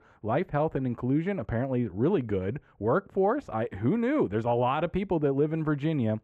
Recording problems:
muffled; very; fading above 3.5 kHz

